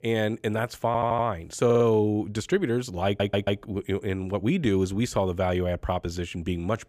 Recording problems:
audio stuttering; at 1 s, at 1.5 s and at 3 s

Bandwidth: 15 kHz